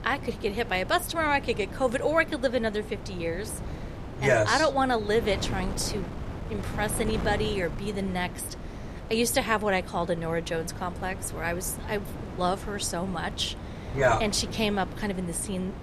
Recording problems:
wind noise on the microphone; occasional gusts; 15 dB below the speech

